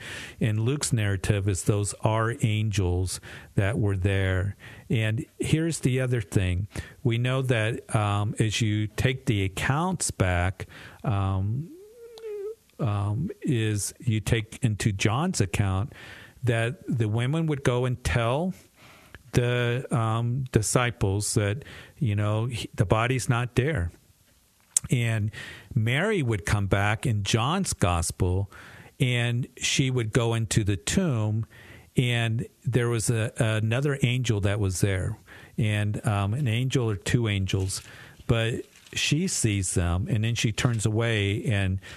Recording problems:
squashed, flat; heavily

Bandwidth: 13.5 kHz